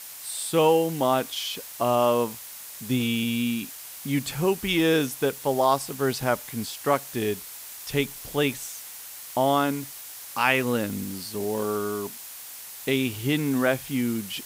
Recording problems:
hiss; noticeable; throughout; 10 dB below the speech

